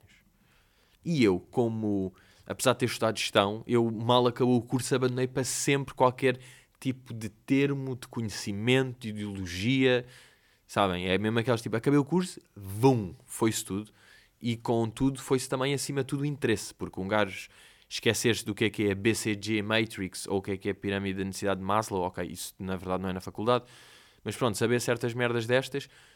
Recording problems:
none

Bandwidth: 17 kHz